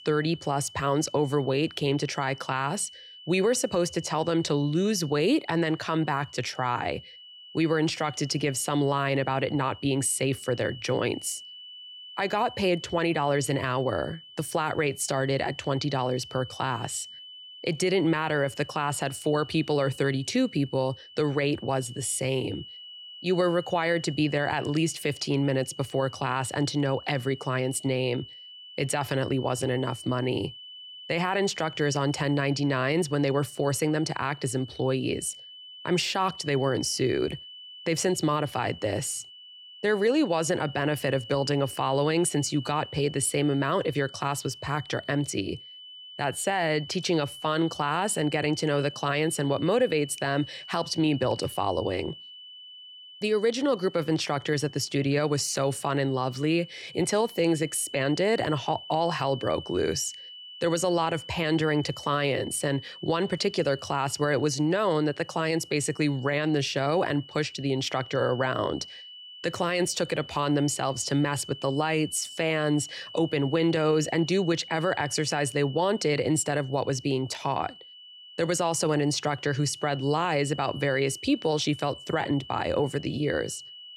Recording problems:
high-pitched whine; noticeable; throughout; 3 kHz, 15 dB below the speech

